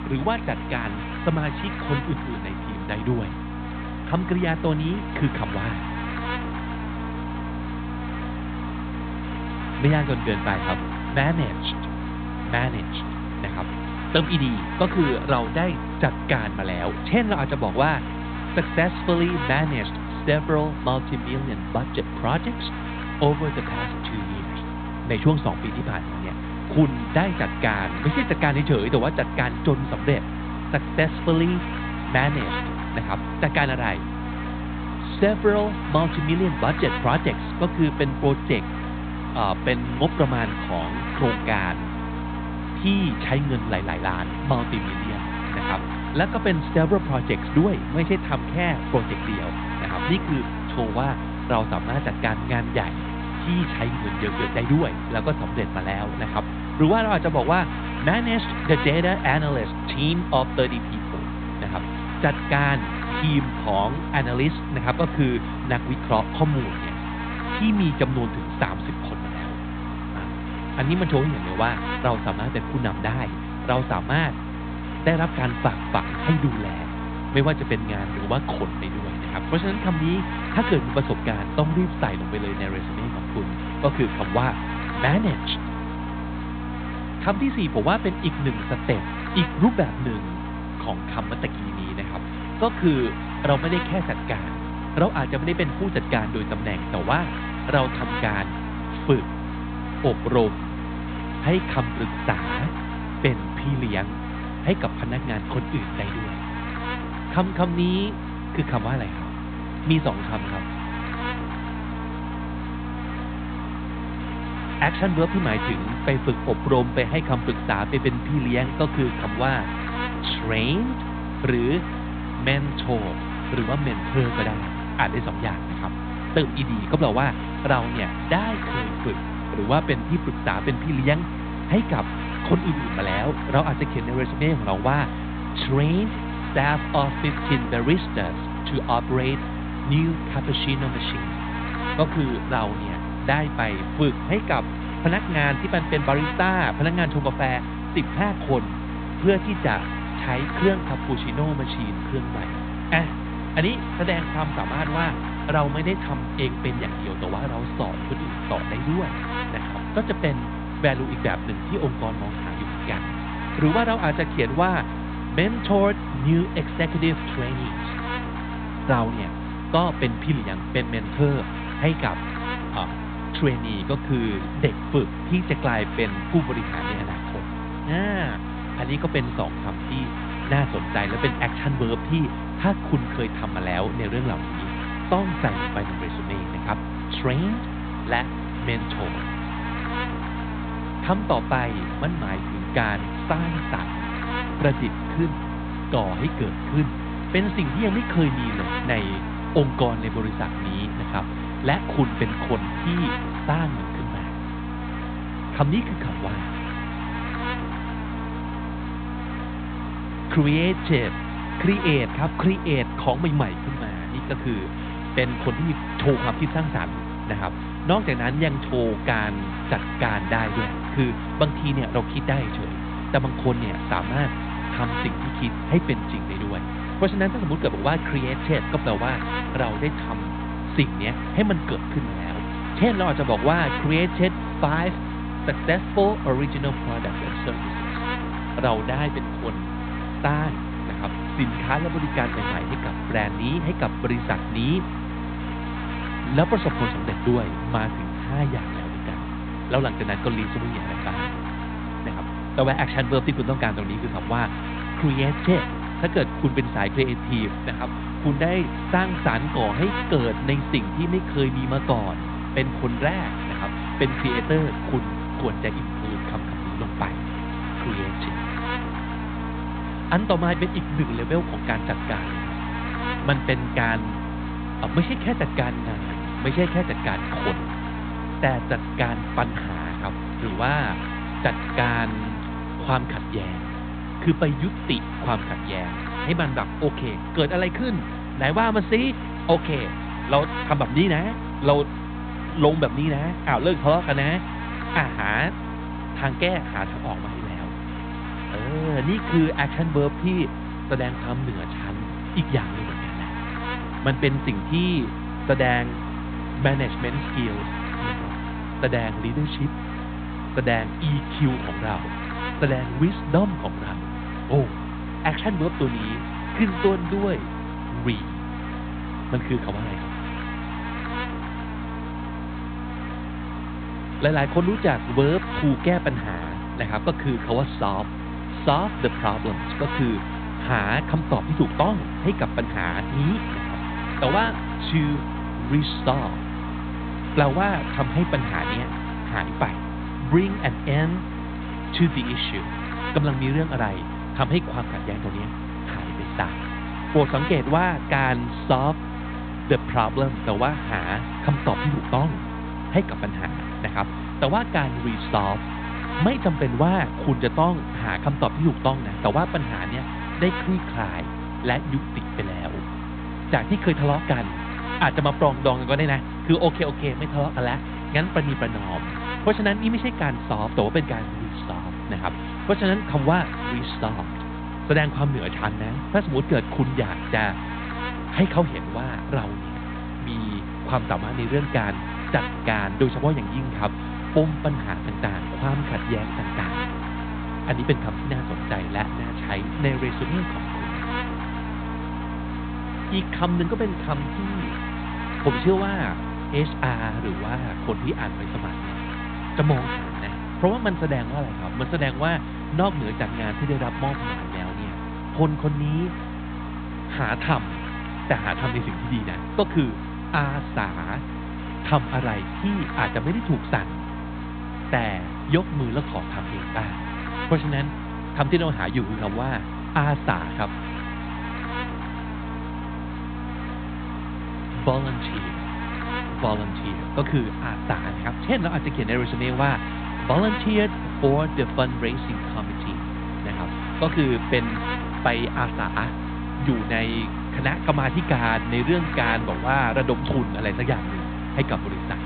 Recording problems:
high frequencies cut off; severe; nothing above 4 kHz
electrical hum; loud; throughout; 60 Hz, 6 dB below the speech

